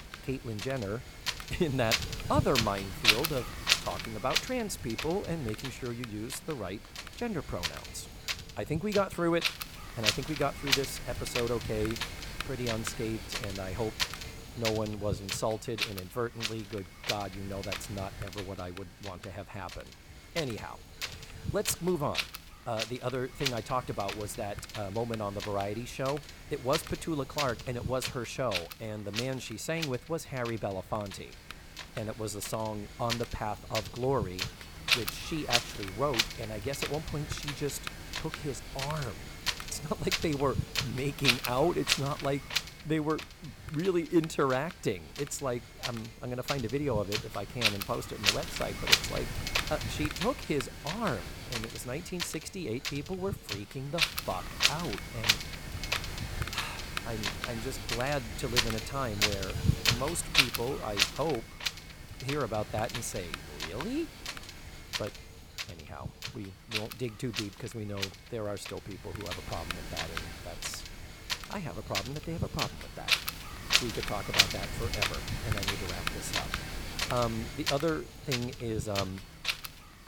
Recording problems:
wind noise on the microphone; heavy; 3 dB above the speech

